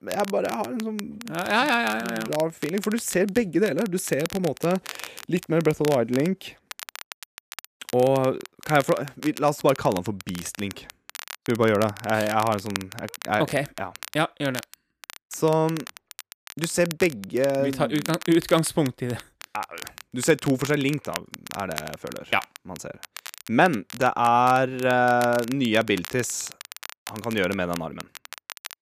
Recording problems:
crackle, like an old record; noticeable; 15 dB below the speech

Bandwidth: 14.5 kHz